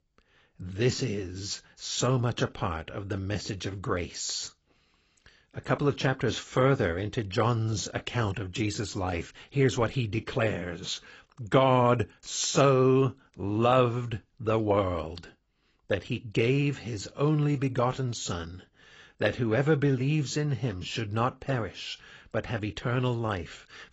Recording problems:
garbled, watery; badly; nothing above 7.5 kHz

